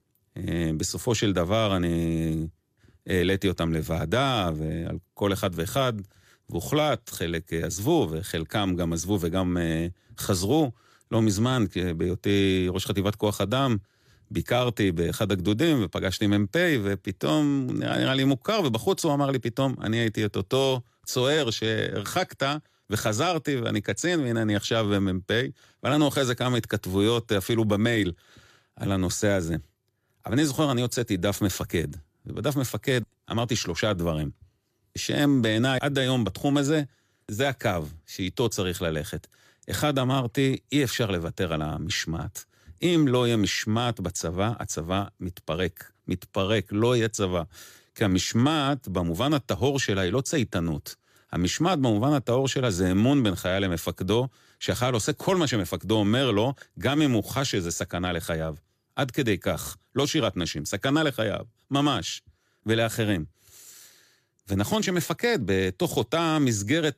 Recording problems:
none

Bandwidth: 15 kHz